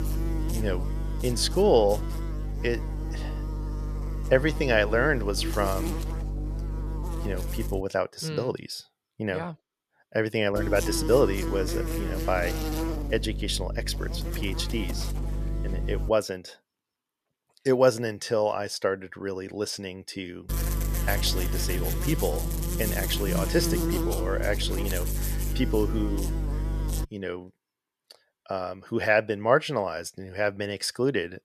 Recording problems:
electrical hum; loud; until 8 s, from 11 to 16 s and from 20 to 27 s; 50 Hz, 10 dB below the speech

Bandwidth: 14 kHz